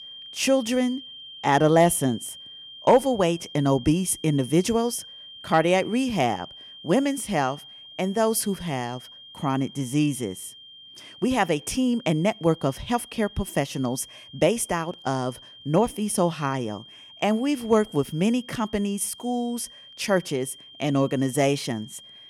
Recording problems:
high-pitched whine; noticeable; throughout; 3 kHz, 20 dB below the speech

